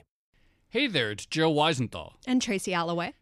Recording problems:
none

